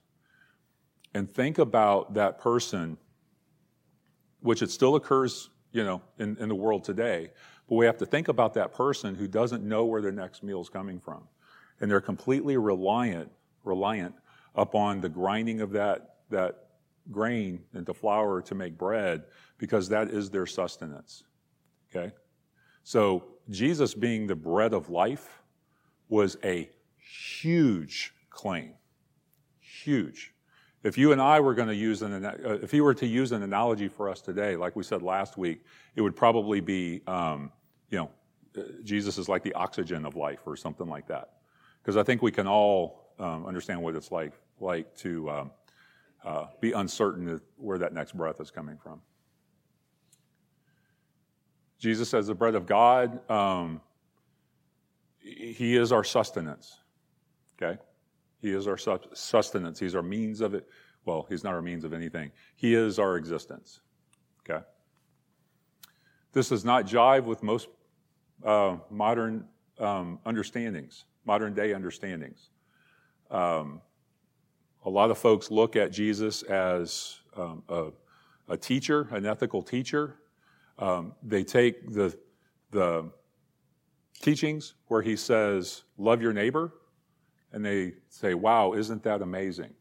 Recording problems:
none

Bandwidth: 16 kHz